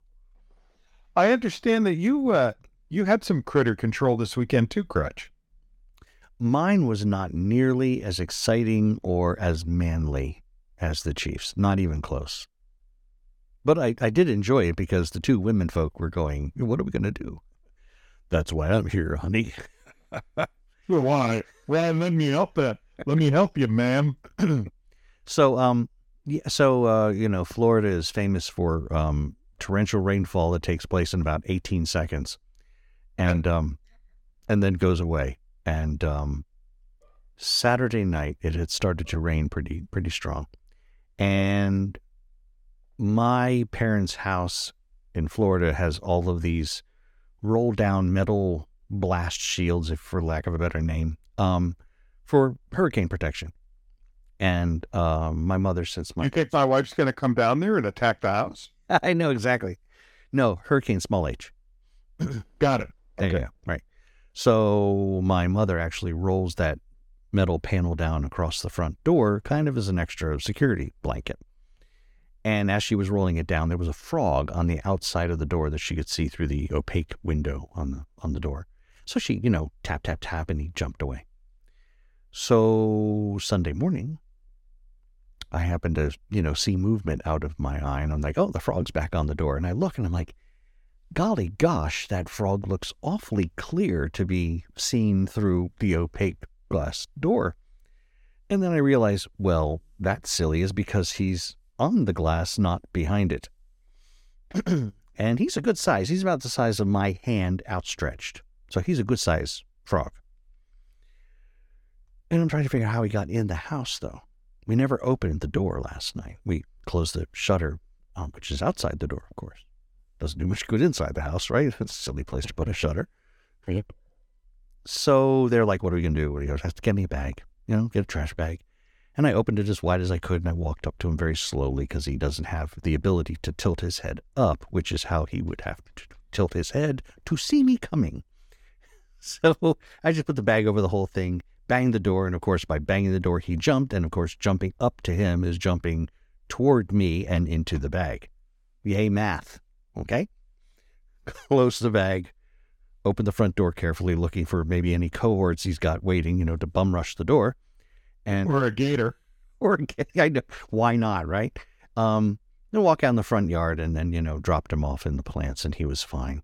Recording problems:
none

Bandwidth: 17.5 kHz